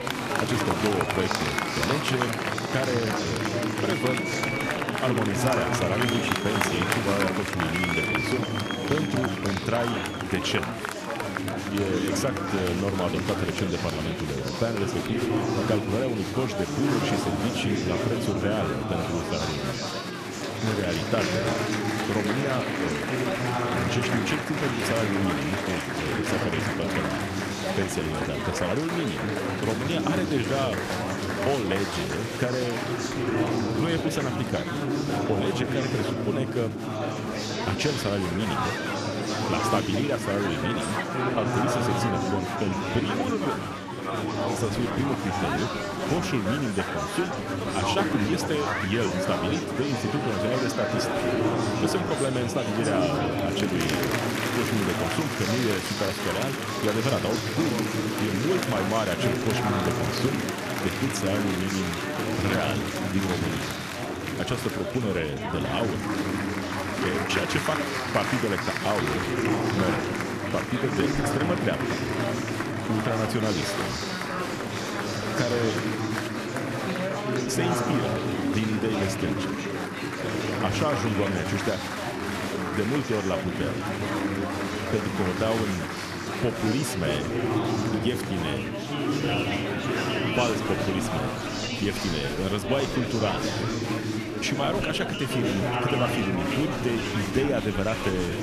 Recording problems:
chatter from many people; very loud; throughout; 2 dB above the speech

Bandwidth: 14.5 kHz